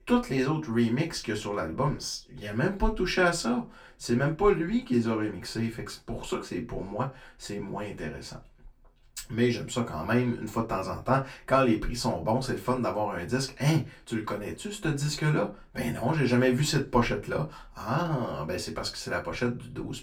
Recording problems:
off-mic speech; far
room echo; very slight; dies away in 0.2 s

